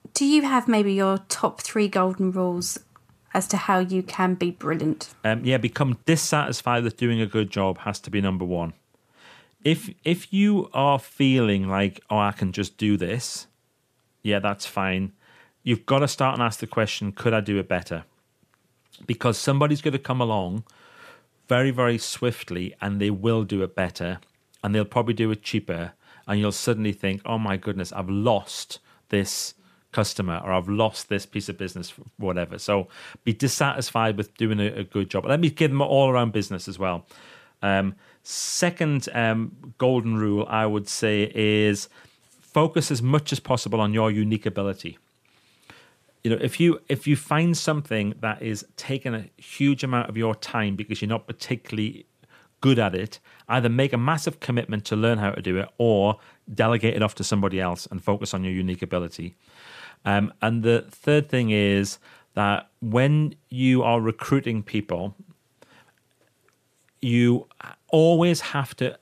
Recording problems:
none

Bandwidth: 14.5 kHz